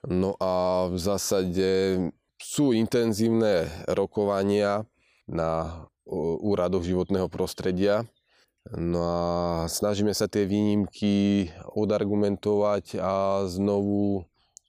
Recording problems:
none

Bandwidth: 15 kHz